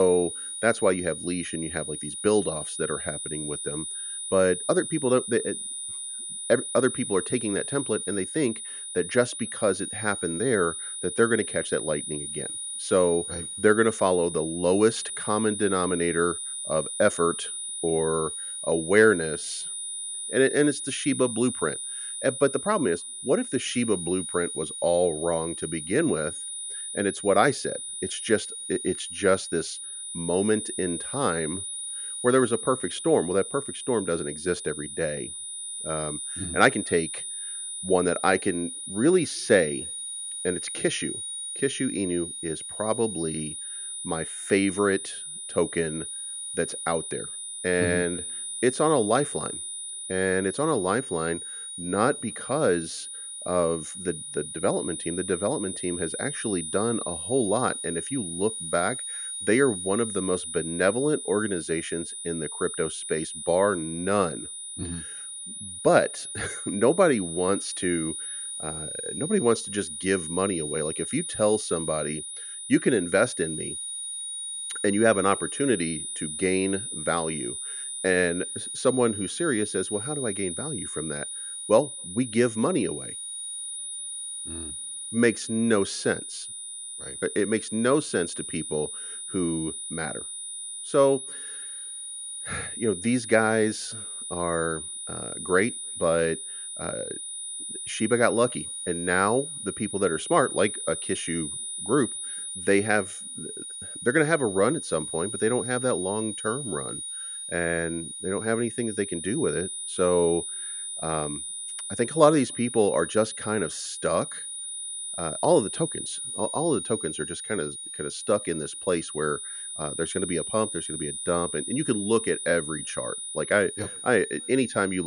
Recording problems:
high-pitched whine; loud; throughout; 9.5 kHz, 6 dB below the speech
abrupt cut into speech; at the start and the end

